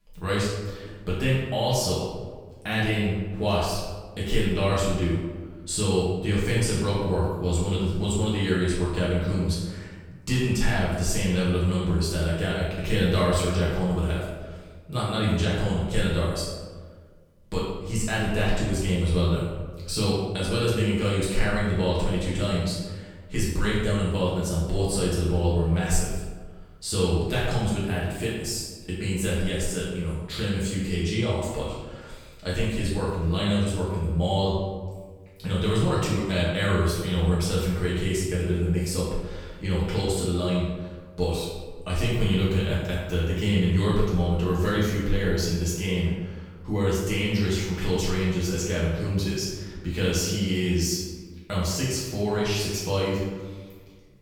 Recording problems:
off-mic speech; far
room echo; noticeable; dies away in 1.1 s

